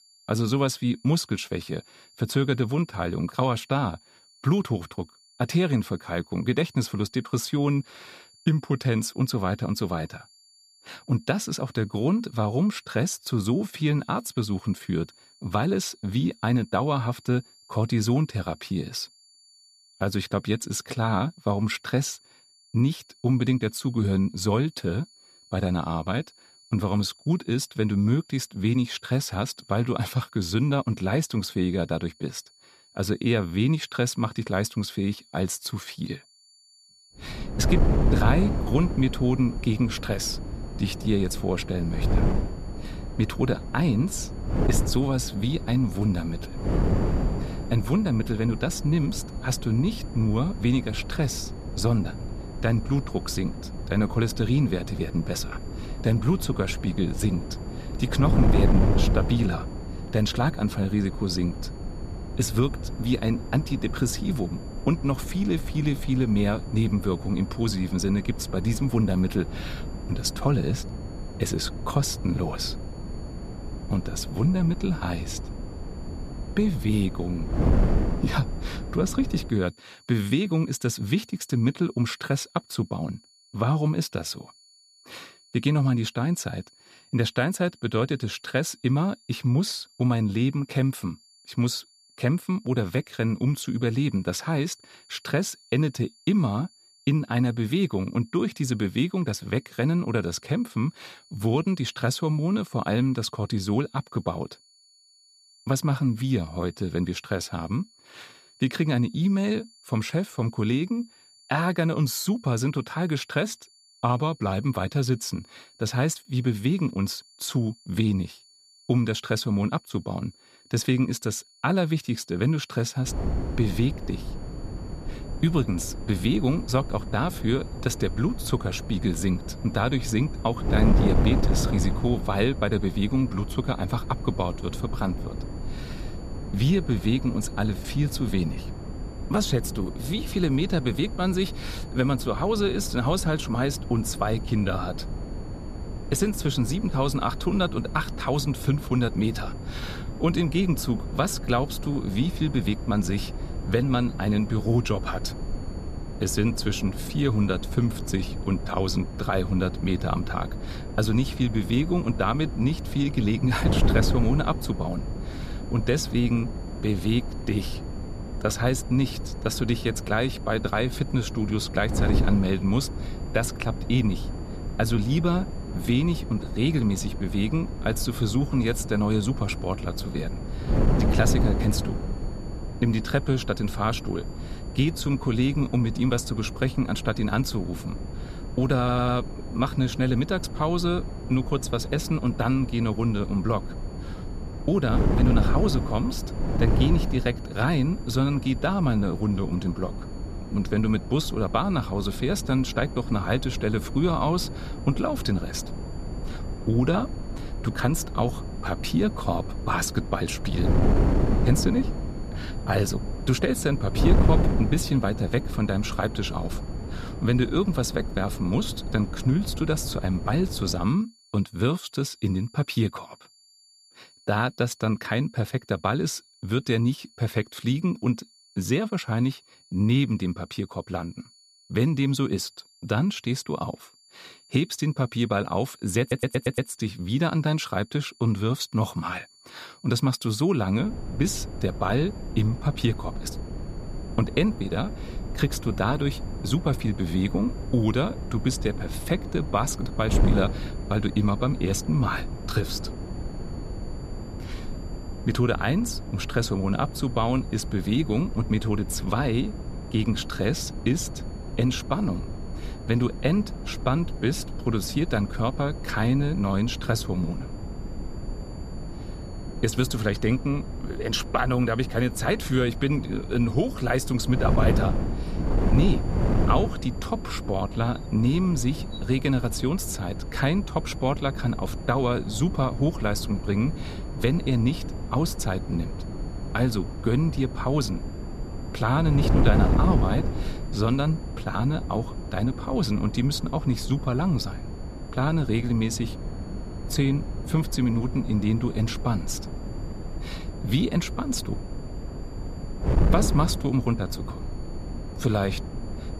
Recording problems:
wind noise on the microphone; heavy; from 37 s to 1:19, from 2:03 to 3:41 and from 4:01 on; 10 dB below the speech
high-pitched whine; faint; throughout; 4.5 kHz, 30 dB below the speech
audio stuttering; at 3:09 and at 3:56

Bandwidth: 14.5 kHz